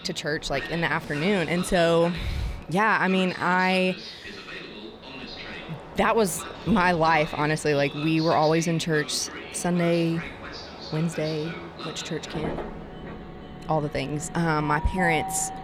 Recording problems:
train or aircraft noise; noticeable; throughout; 10 dB below the speech

